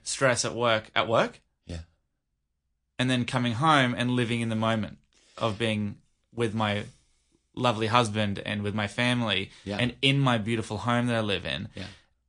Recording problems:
garbled, watery; slightly; nothing above 9 kHz

